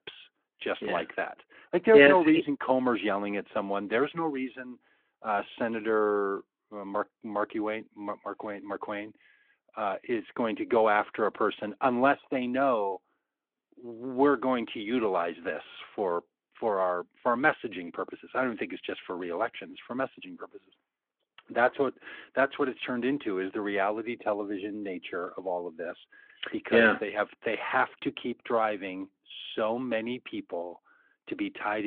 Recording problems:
phone-call audio
abrupt cut into speech; at the end

